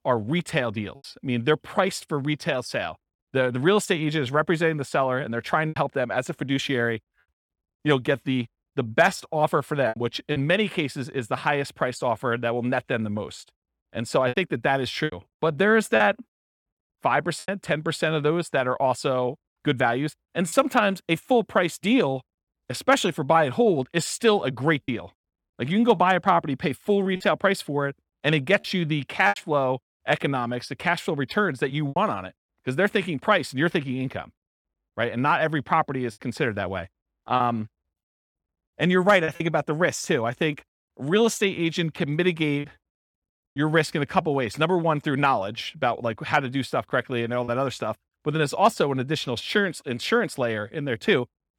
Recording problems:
choppy; occasionally; 3% of the speech affected

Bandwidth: 18 kHz